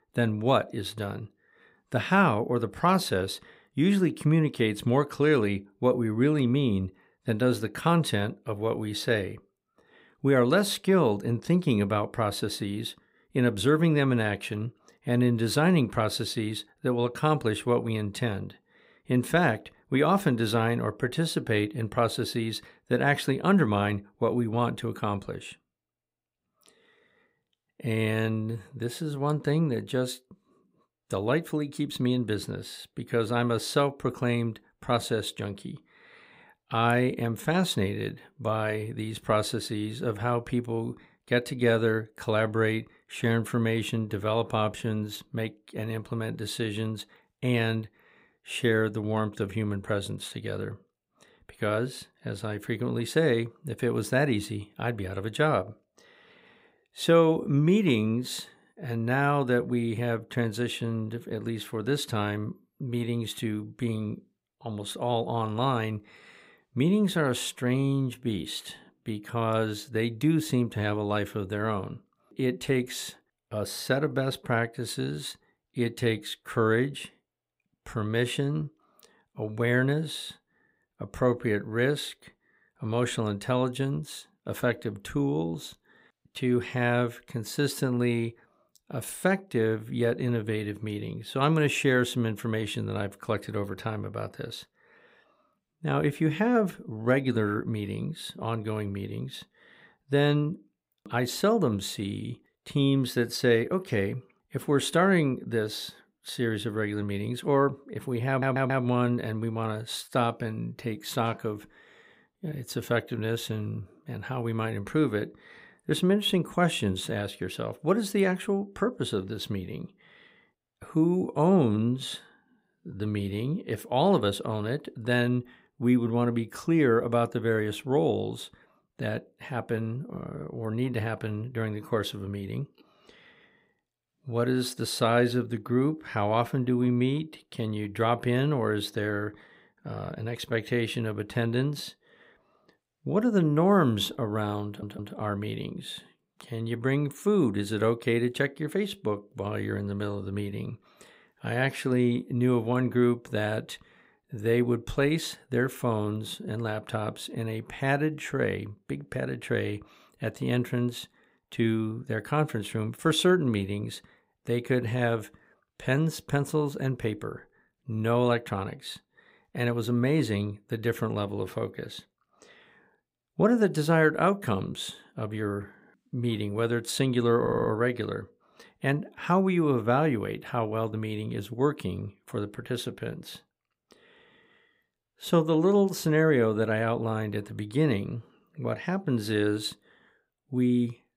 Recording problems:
audio stuttering; at 1:48, at 2:25 and at 2:57

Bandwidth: 15.5 kHz